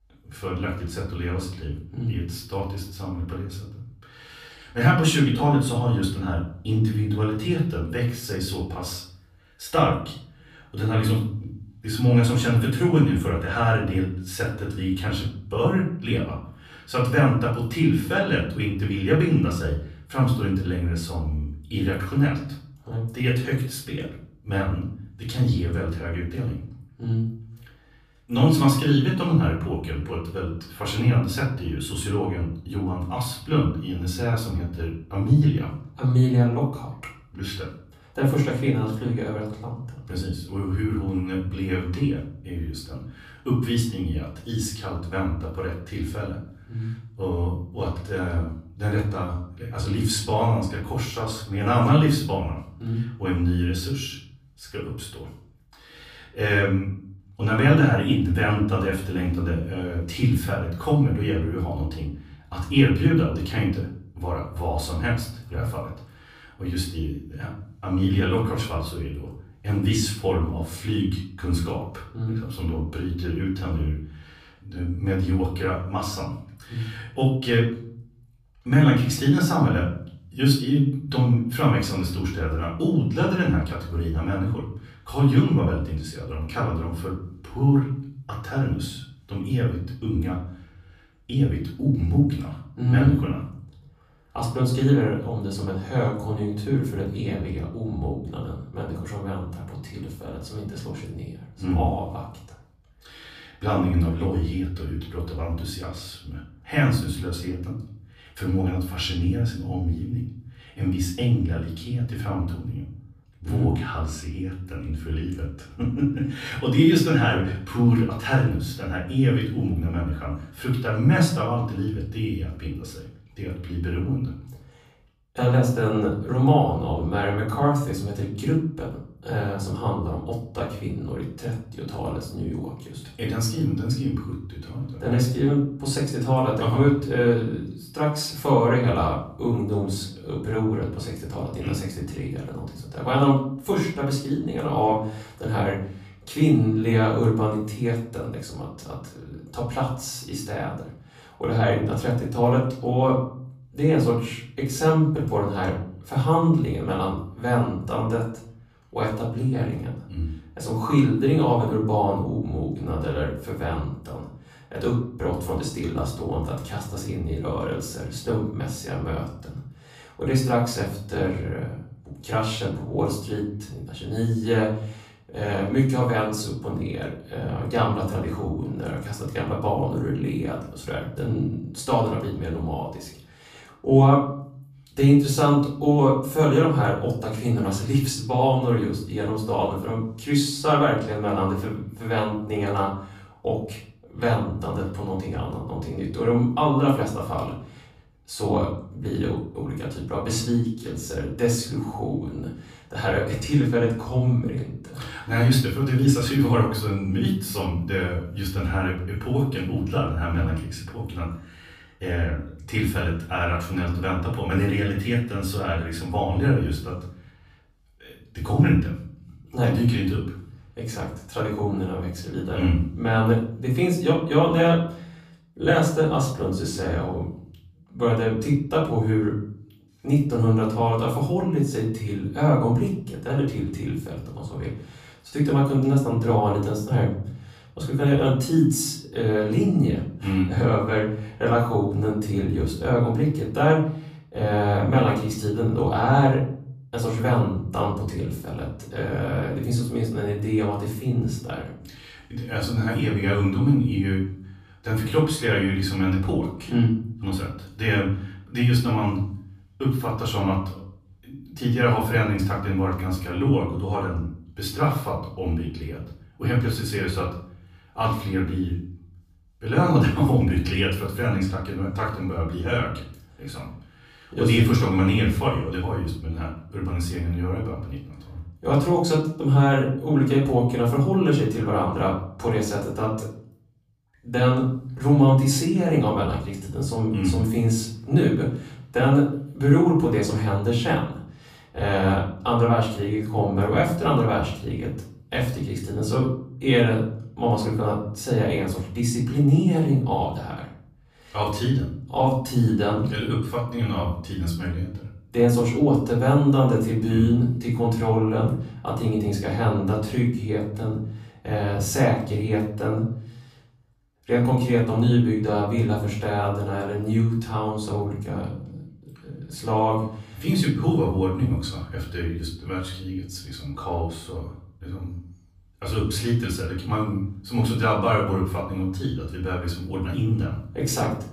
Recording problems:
off-mic speech; far
room echo; noticeable; dies away in 0.6 s

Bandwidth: 15 kHz